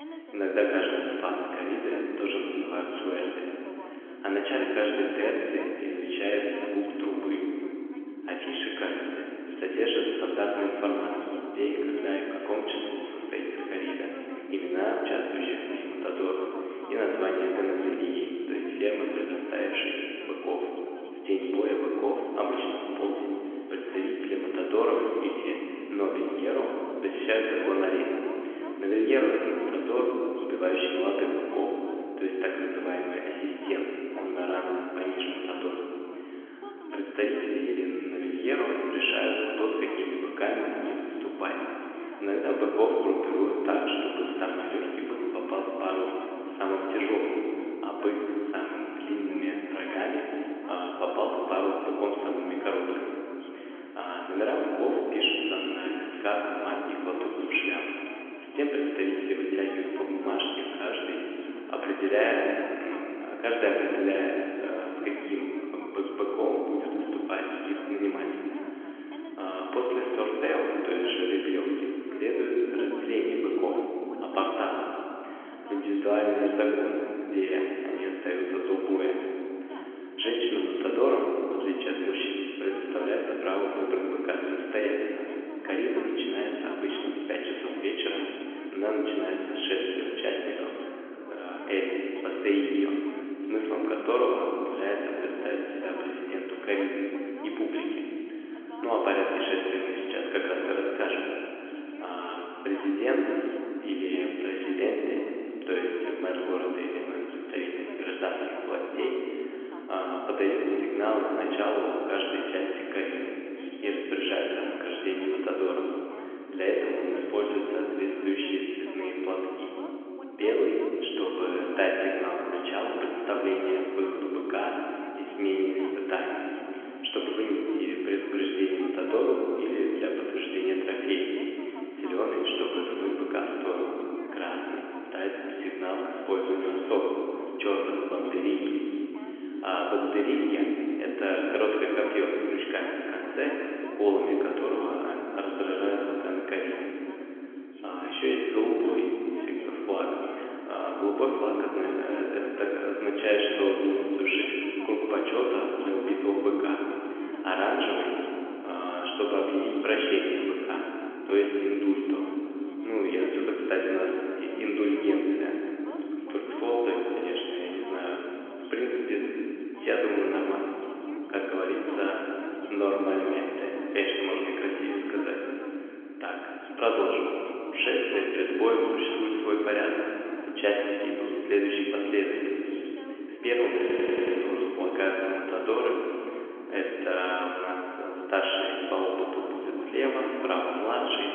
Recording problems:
room echo; noticeable; dies away in 3 s
phone-call audio; nothing above 3.5 kHz
off-mic speech; somewhat distant
voice in the background; noticeable; throughout; 15 dB below the speech
audio stuttering; at 3:04

